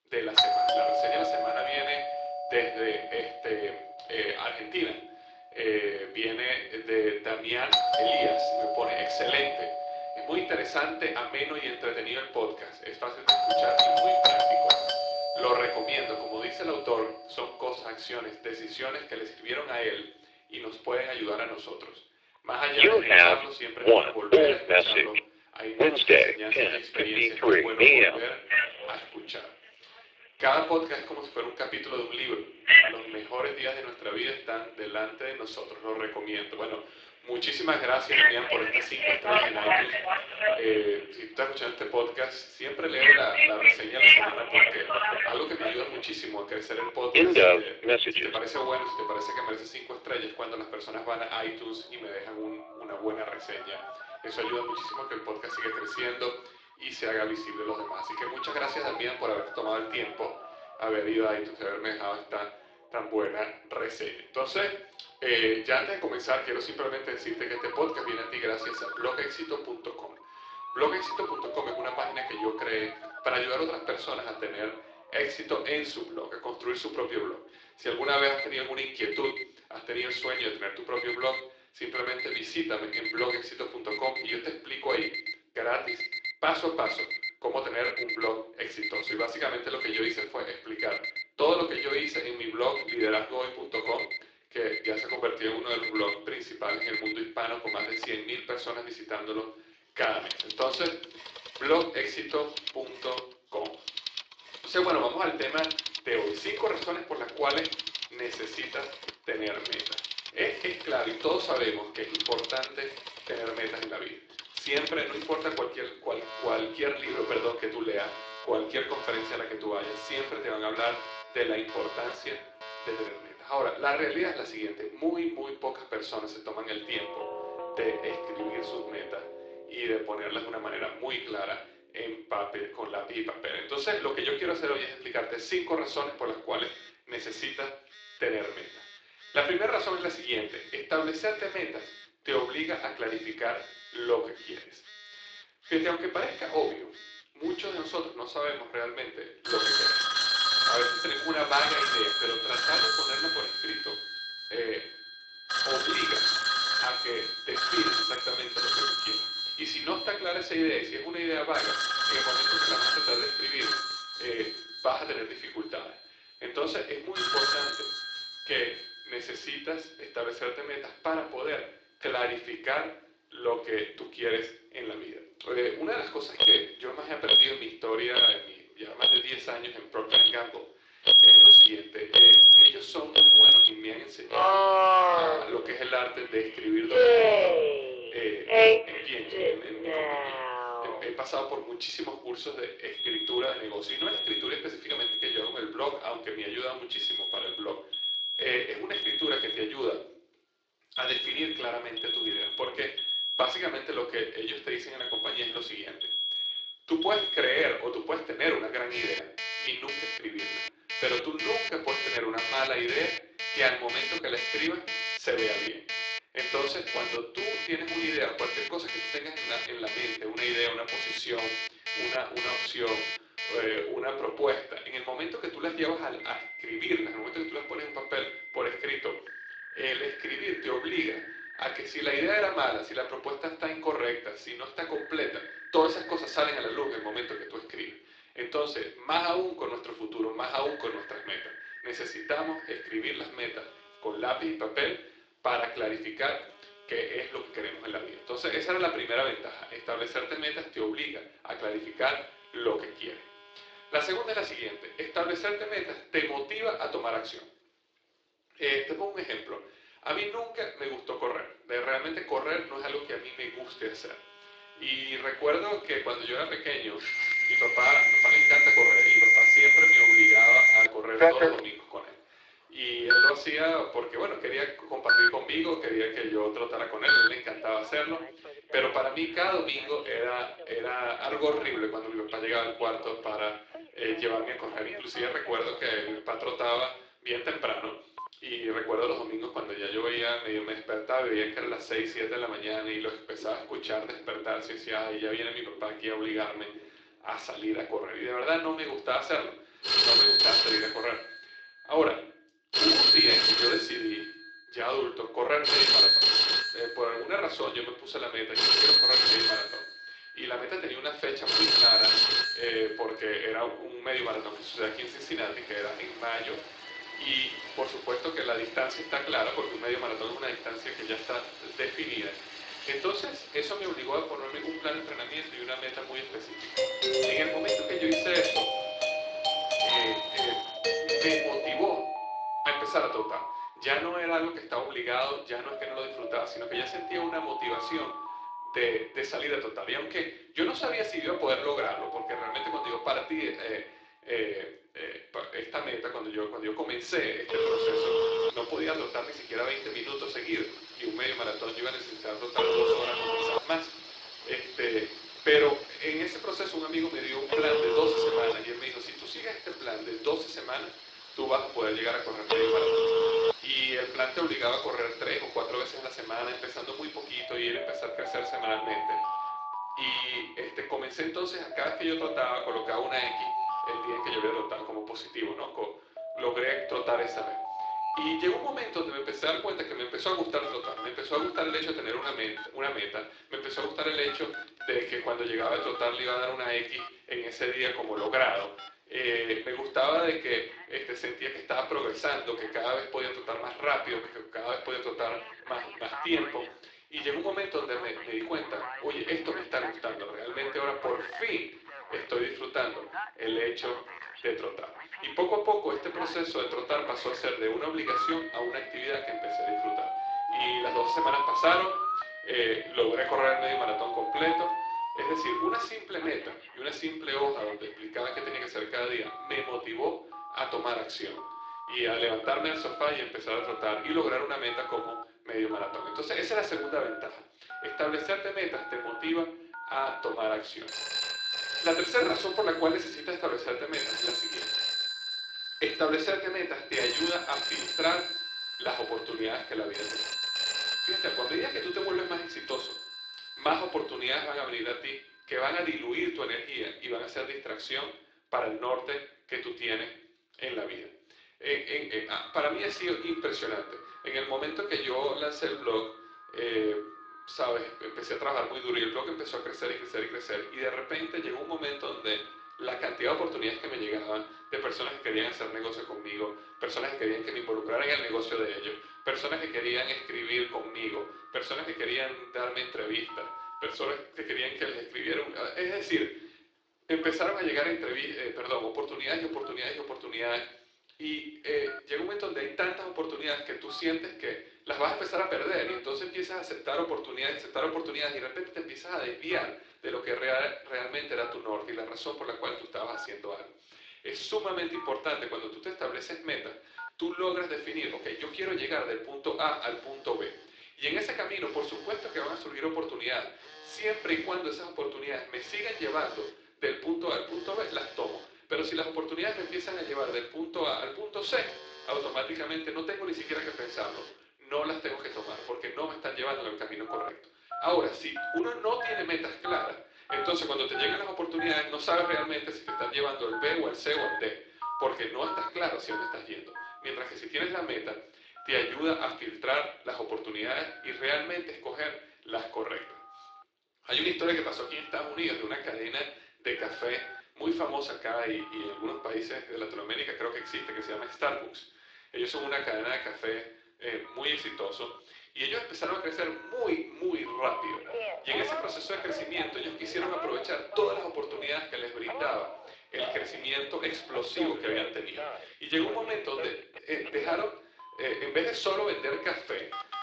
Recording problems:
thin; very; fading below 300 Hz
room echo; slight; dies away in 0.4 s
off-mic speech; somewhat distant
garbled, watery; slightly
alarms or sirens; very loud; throughout; 8 dB above the speech
doorbell; loud; from 5:27 to 5:32; peak 8 dB above the speech

